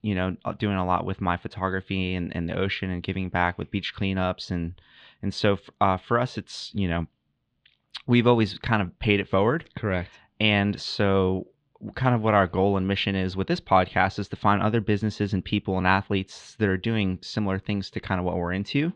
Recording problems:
muffled; slightly; fading above 3.5 kHz

